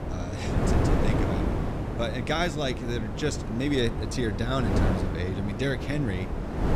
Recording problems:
wind noise on the microphone; heavy; 2 dB below the speech

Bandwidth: 15 kHz